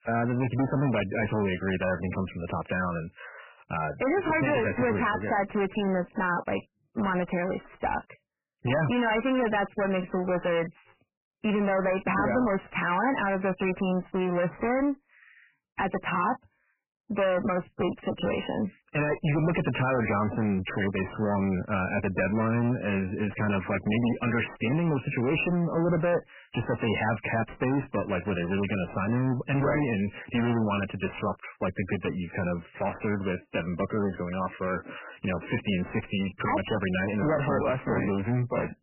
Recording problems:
distortion; heavy; 22% of the sound clipped
garbled, watery; badly; nothing above 3 kHz

